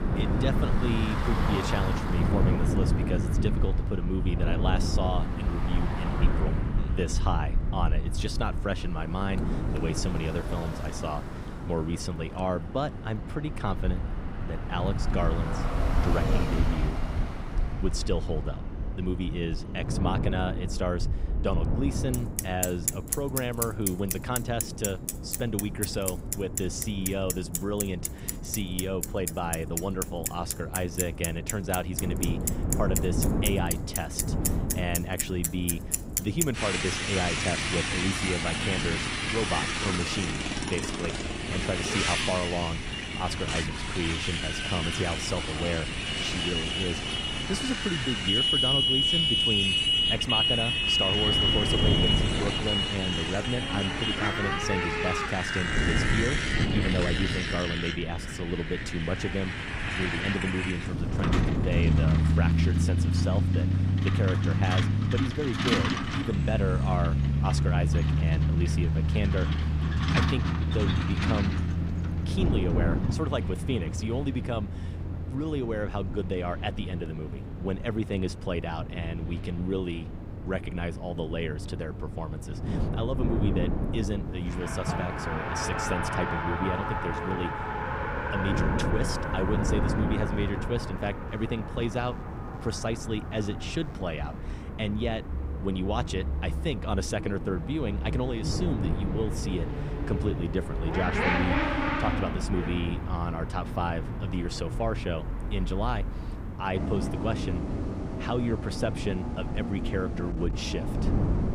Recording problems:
traffic noise; very loud; throughout; 3 dB above the speech
wind noise on the microphone; heavy; 8 dB below the speech

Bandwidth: 15.5 kHz